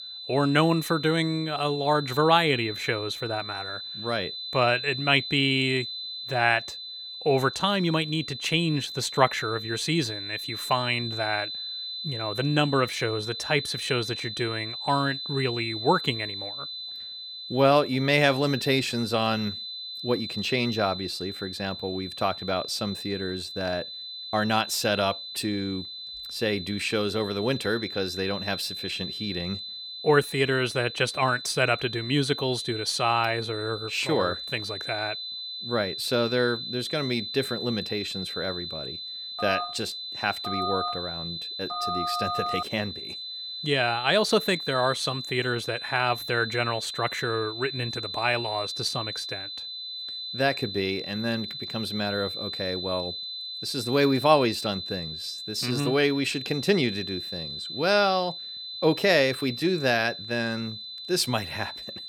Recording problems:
high-pitched whine; loud; throughout; 4 kHz, 7 dB below the speech
phone ringing; noticeable; from 39 to 43 s; peak 2 dB below the speech

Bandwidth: 17 kHz